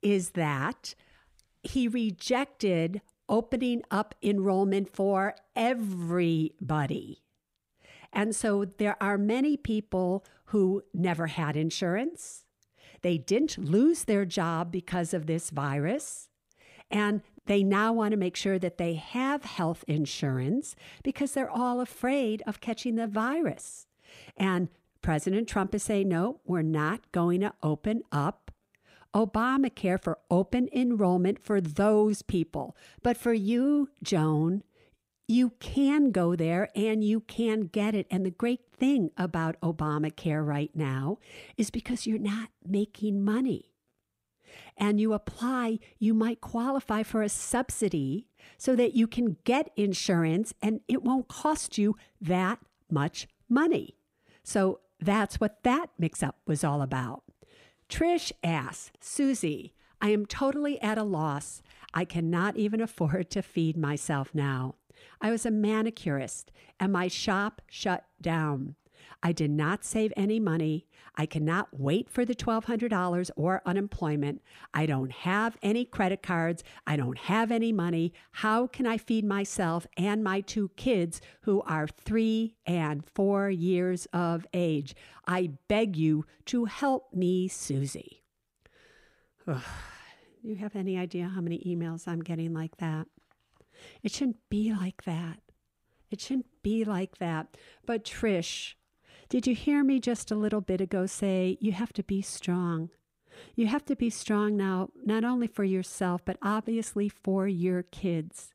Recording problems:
none

